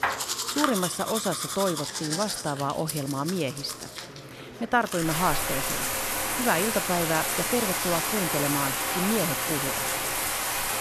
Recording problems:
household noises; very loud; throughout; 1 dB above the speech
murmuring crowd; noticeable; throughout; 15 dB below the speech

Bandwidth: 13.5 kHz